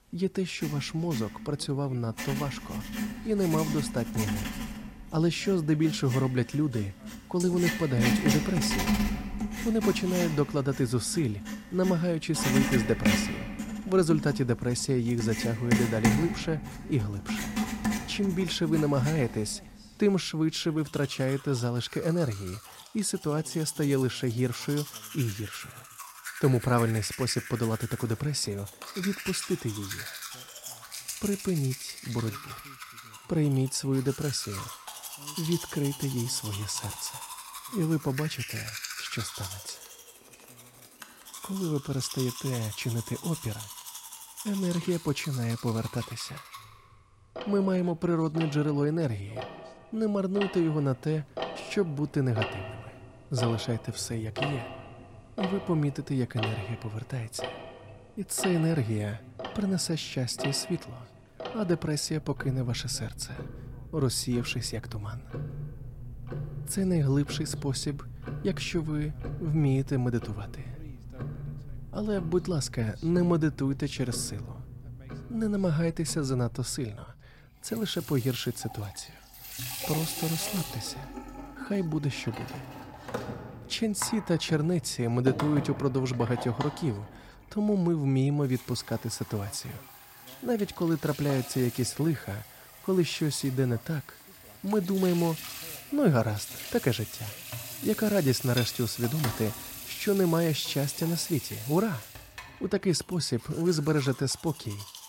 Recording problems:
household noises; loud; throughout; 8 dB below the speech

